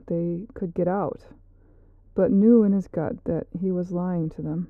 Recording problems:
muffled; very; fading above 1 kHz

